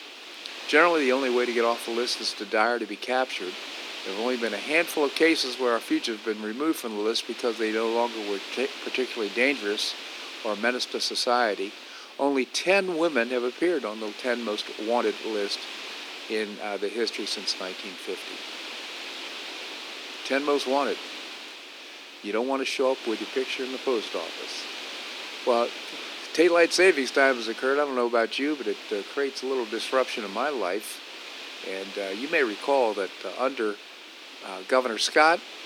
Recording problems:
thin; somewhat; fading below 300 Hz
wind noise on the microphone; occasional gusts; 10 dB below the speech

